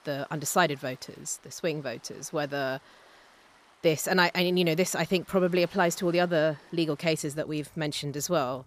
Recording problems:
rain or running water; faint; throughout; 30 dB below the speech

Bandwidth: 14.5 kHz